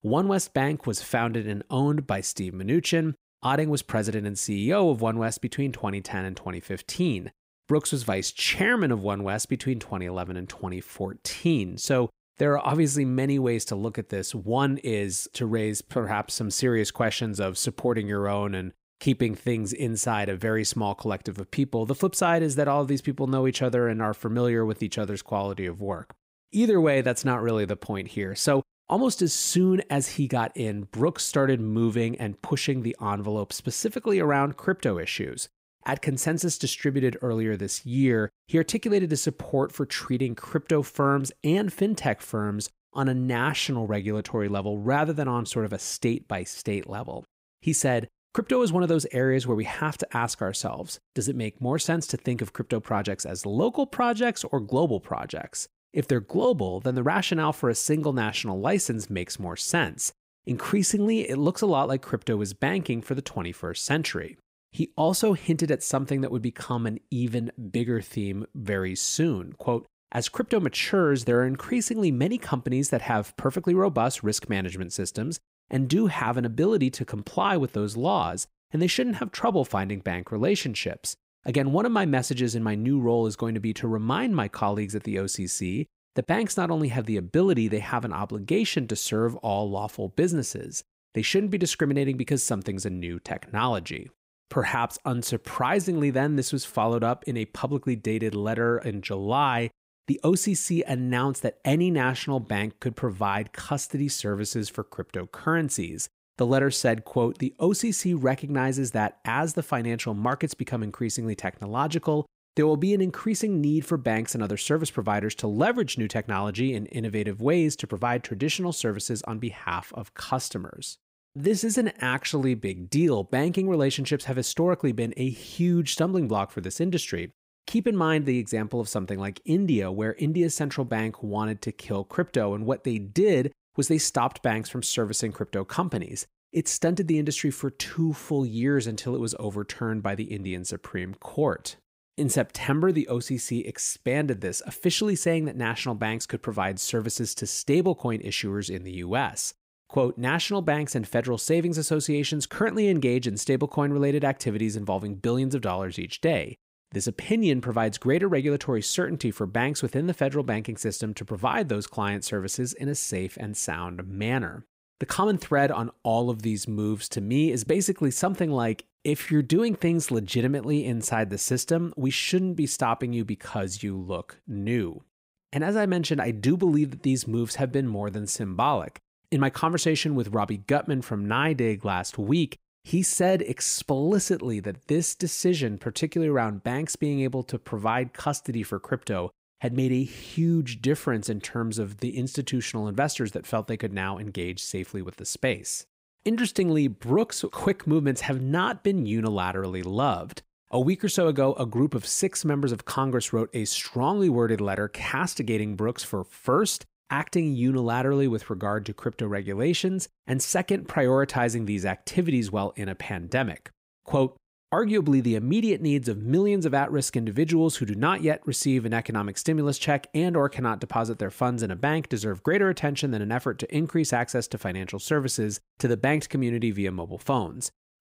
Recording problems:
none

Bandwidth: 15.5 kHz